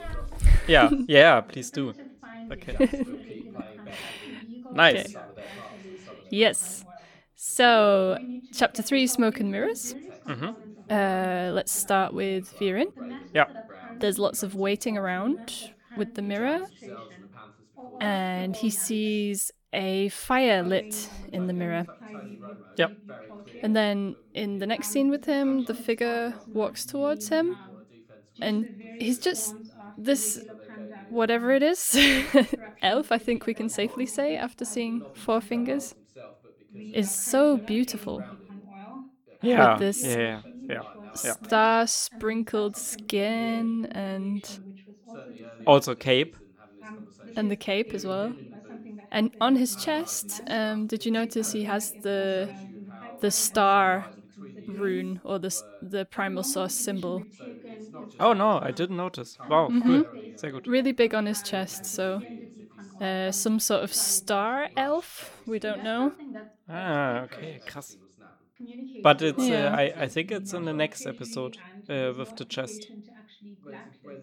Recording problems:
background chatter; noticeable; throughout; 2 voices, 20 dB below the speech

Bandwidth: 18 kHz